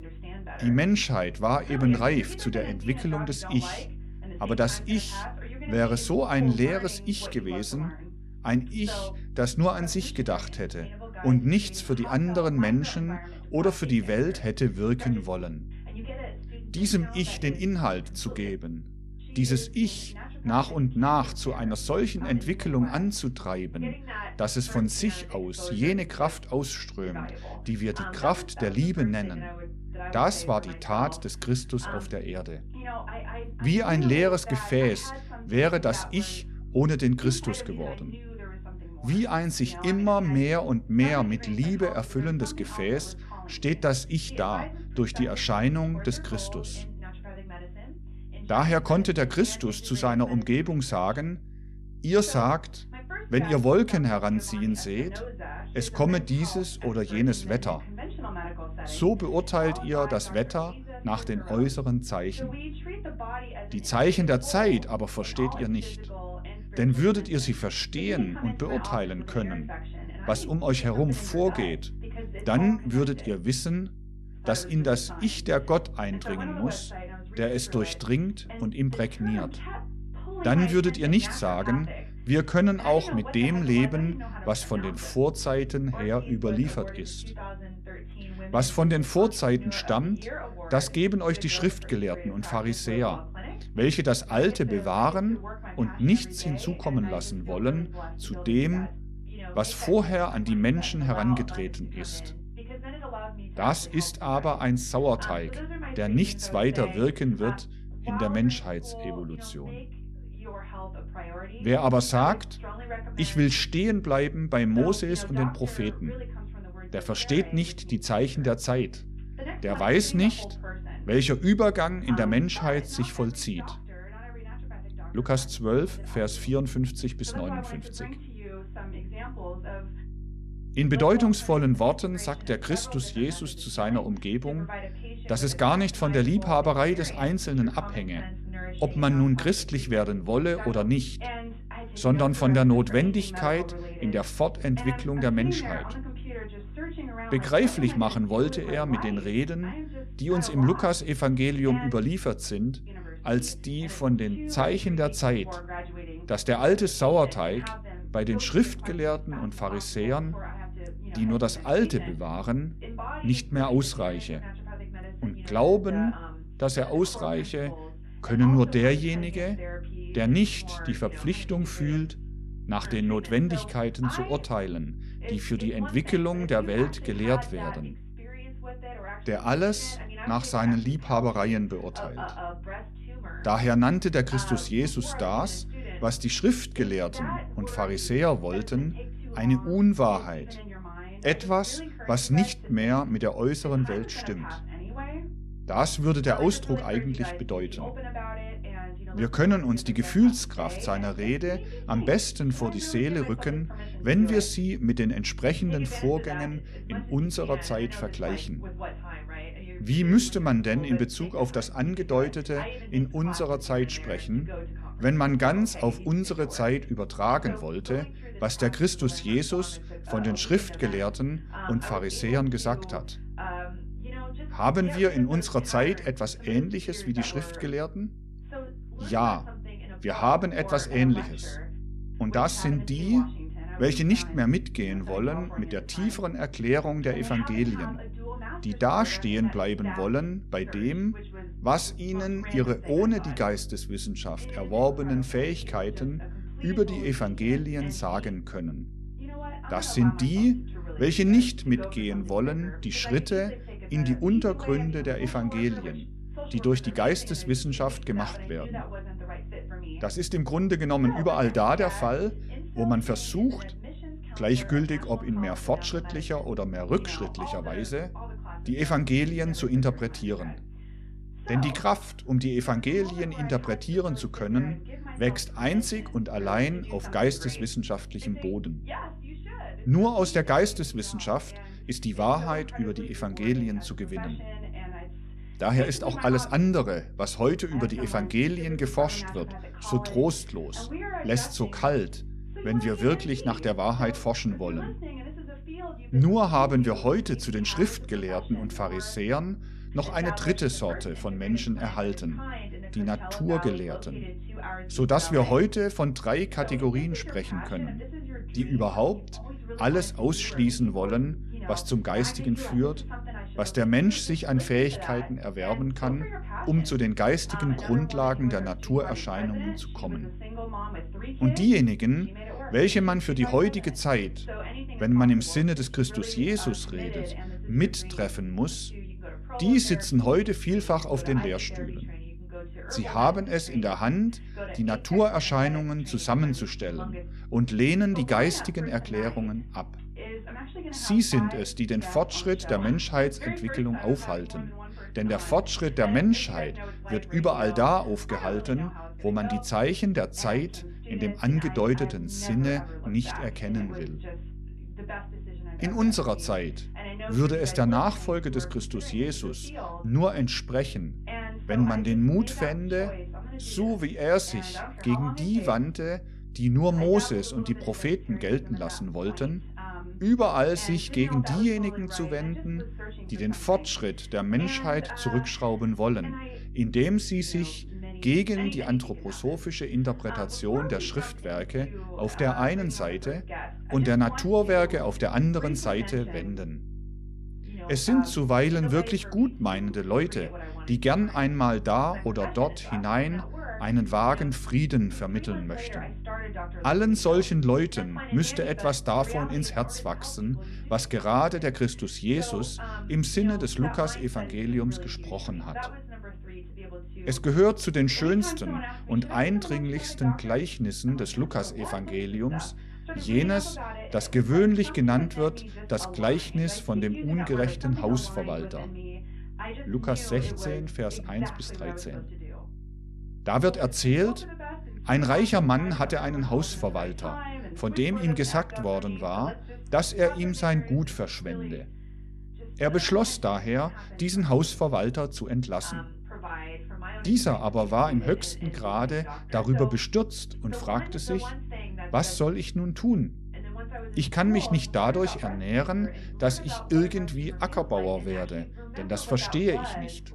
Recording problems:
voice in the background; noticeable; throughout; 15 dB below the speech
electrical hum; faint; throughout; 50 Hz, 25 dB below the speech

